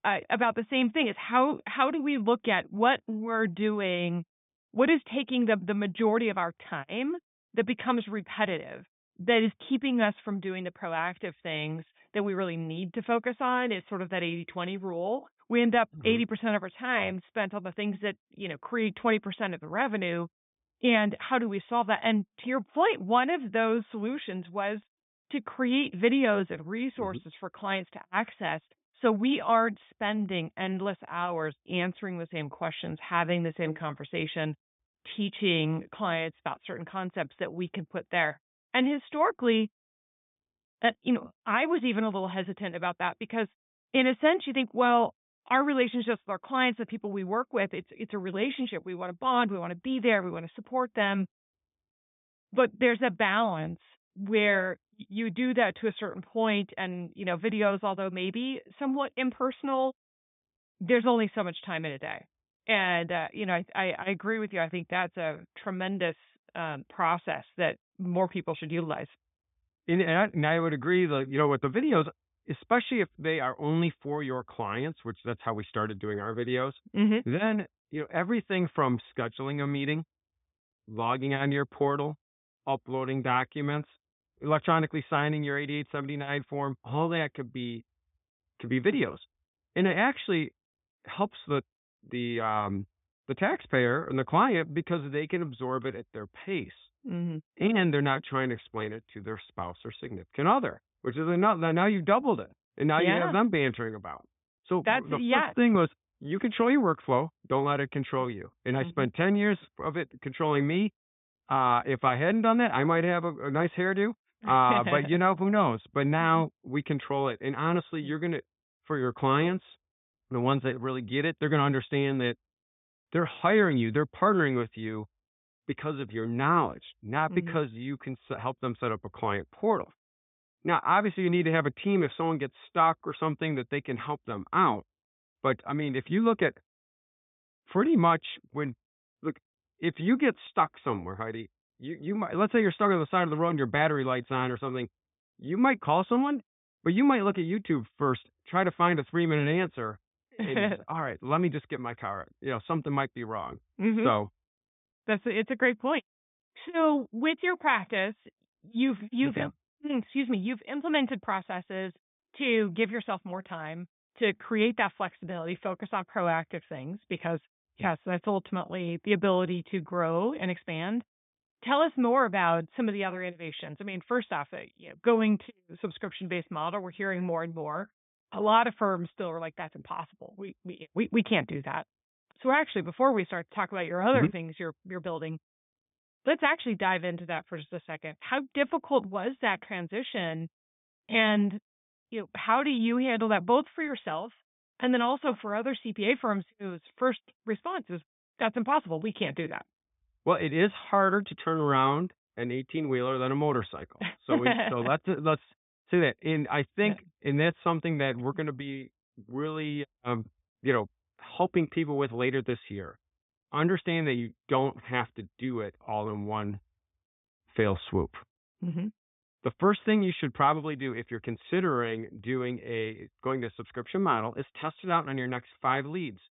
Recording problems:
high frequencies cut off; severe; nothing above 3.5 kHz

